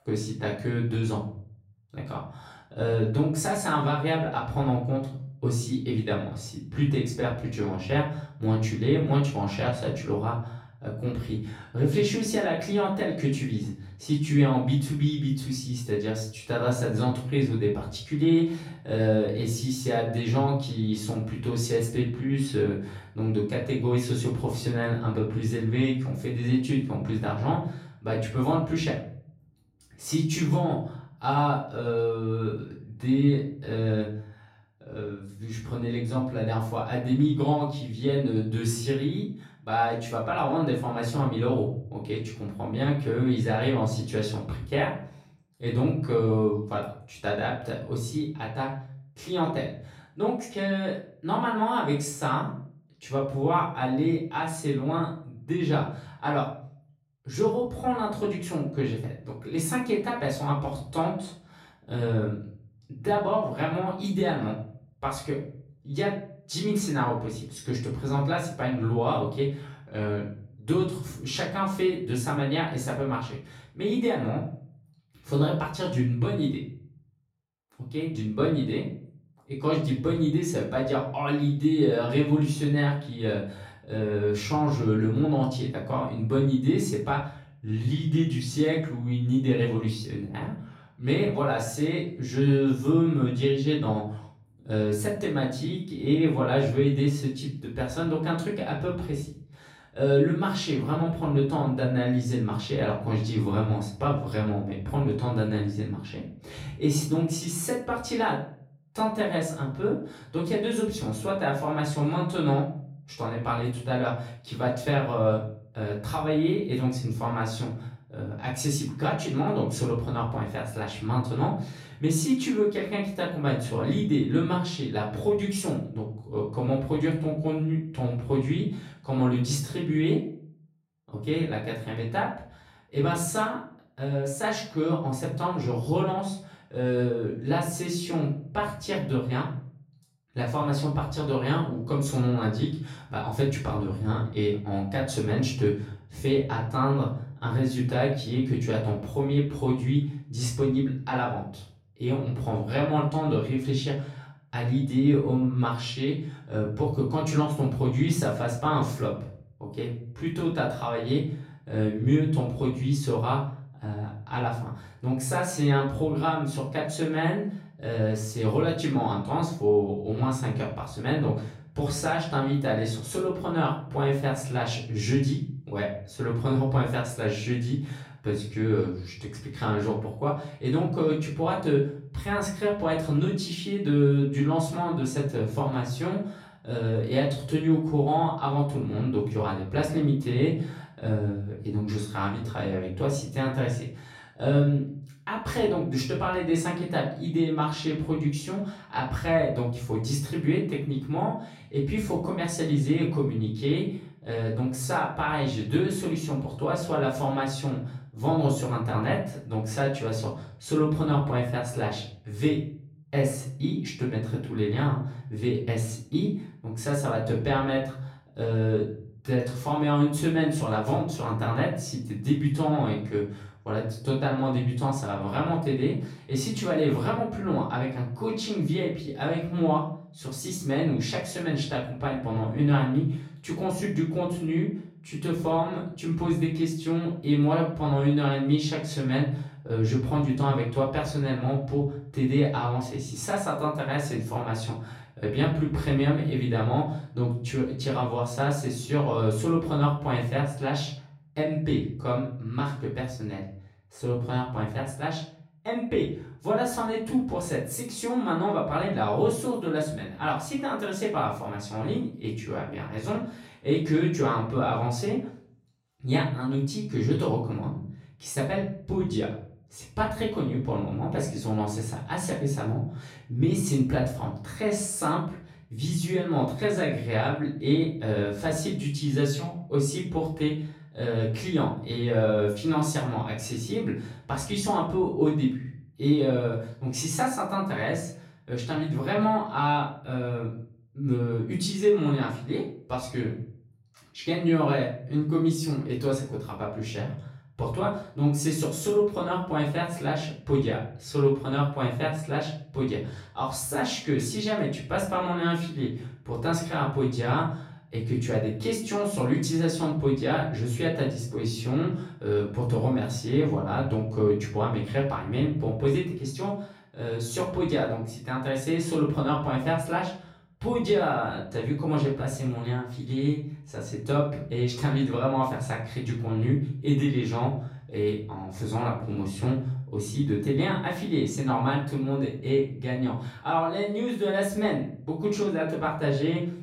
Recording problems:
off-mic speech; far
room echo; slight; dies away in 0.5 s

